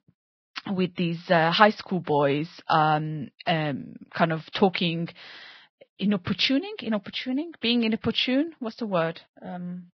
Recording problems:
garbled, watery; badly; nothing above 5 kHz

